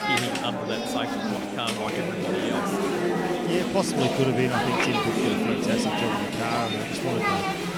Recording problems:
chatter from many people; very loud; throughout; 4 dB above the speech

